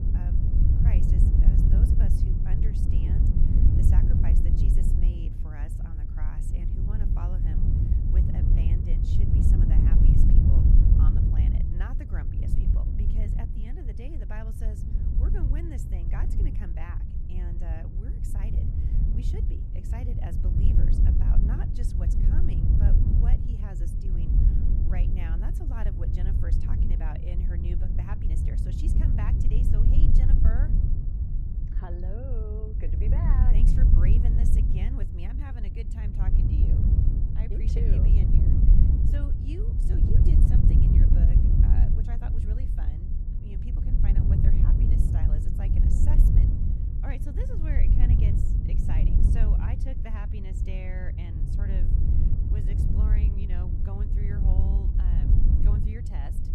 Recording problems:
wind noise on the microphone; heavy; 5 dB above the speech

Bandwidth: 14 kHz